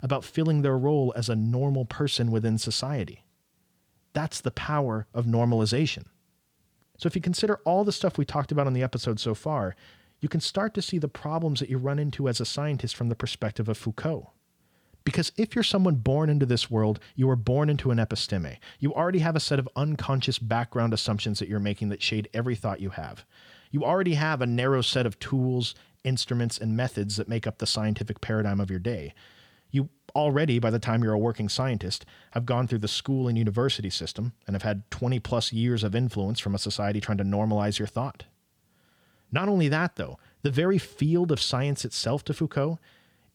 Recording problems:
none

